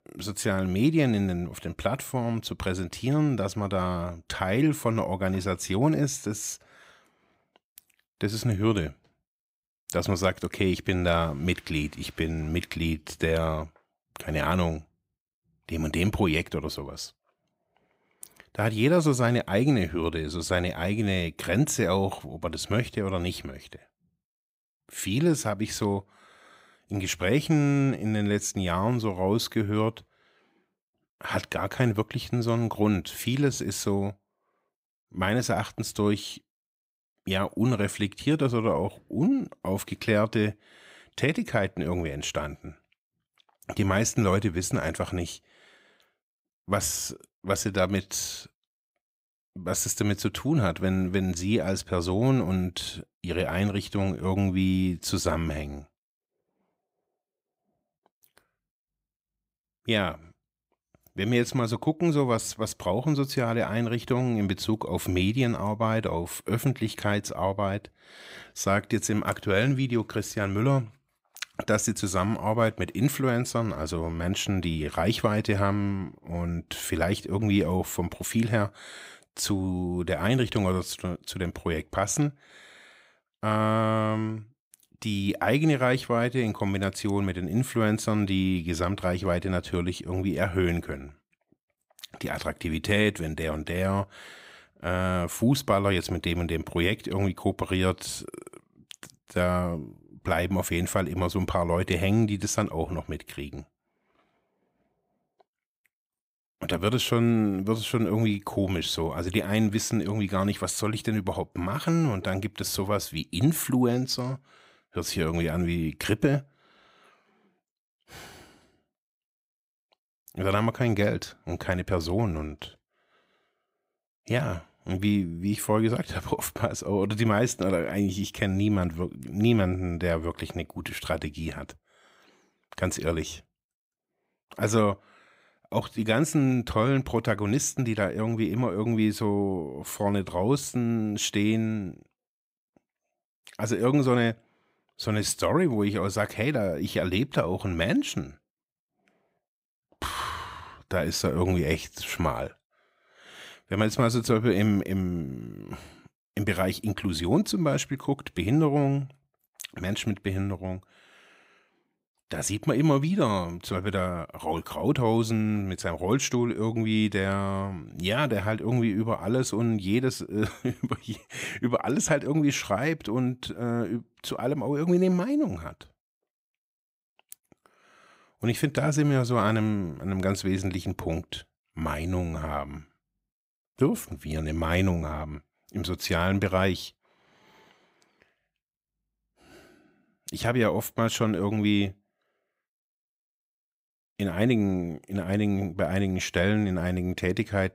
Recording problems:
none

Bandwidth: 15.5 kHz